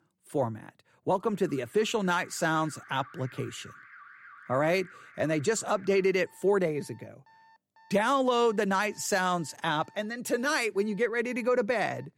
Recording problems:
alarms or sirens; faint; throughout; 25 dB below the speech

